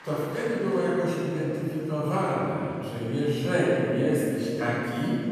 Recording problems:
room echo; strong; dies away in 2.6 s
off-mic speech; far
murmuring crowd; faint; throughout; 20 dB below the speech

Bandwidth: 14.5 kHz